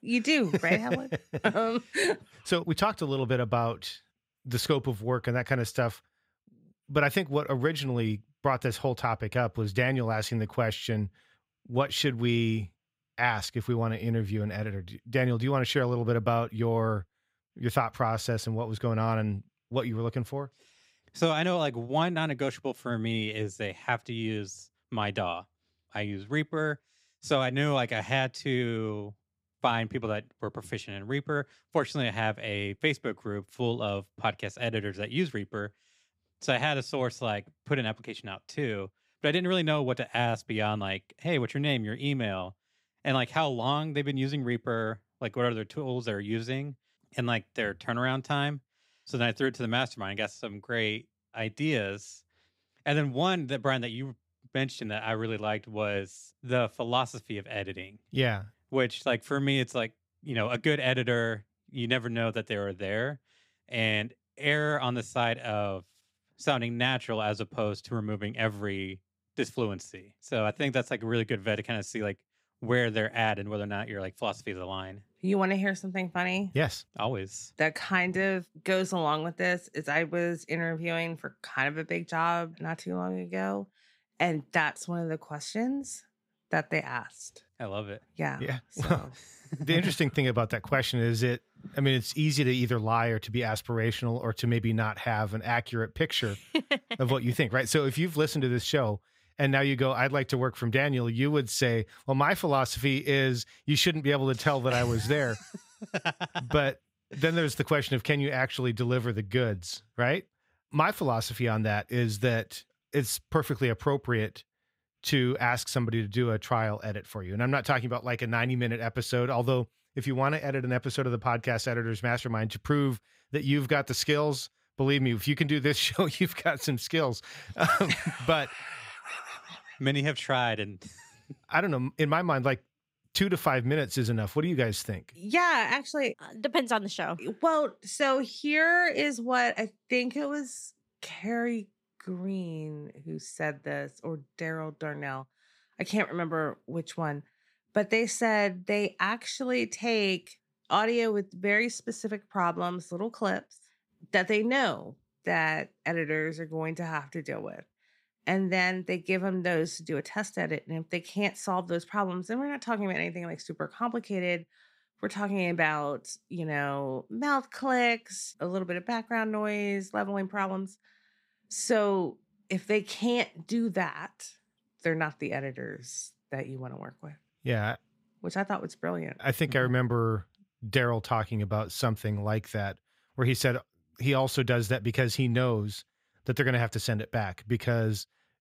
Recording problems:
none

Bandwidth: 15.5 kHz